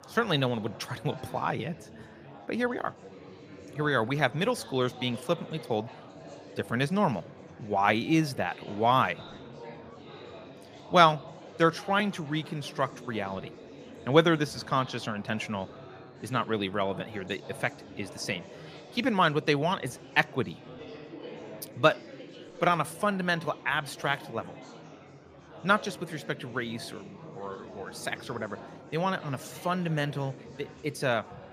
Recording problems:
chatter from many people; noticeable; throughout; 15 dB below the speech

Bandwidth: 15 kHz